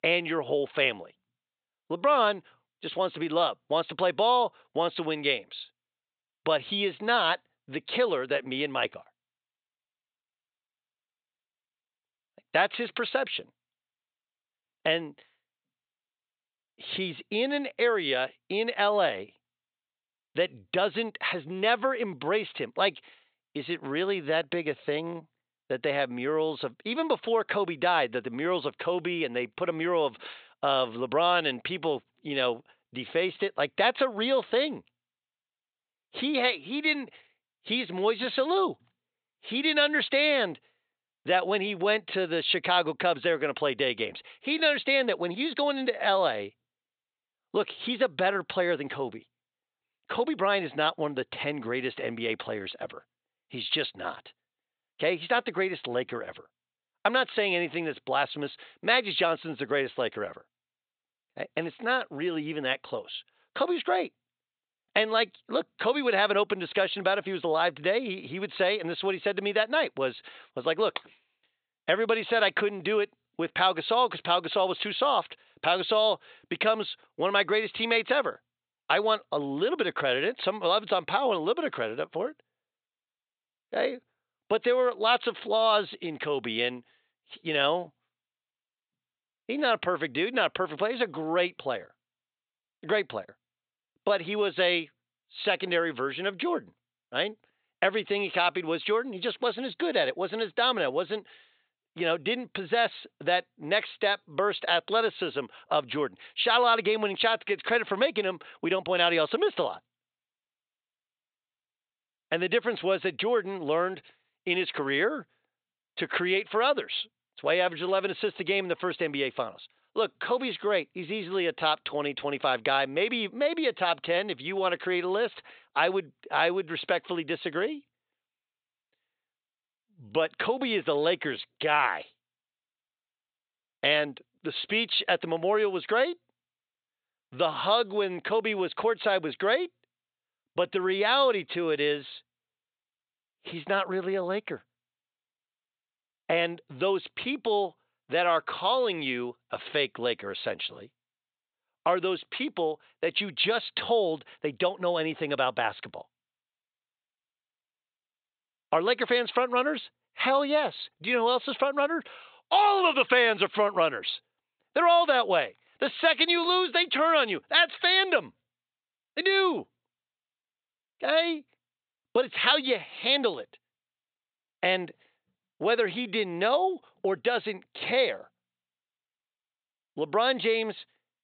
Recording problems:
high frequencies cut off; severe; nothing above 4 kHz
thin; somewhat; fading below 450 Hz

